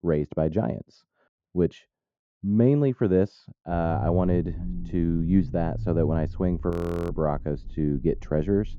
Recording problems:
muffled; very; fading above 1.5 kHz
low rumble; noticeable; from 3.5 s on; 20 dB below the speech
audio freezing; at 6.5 s

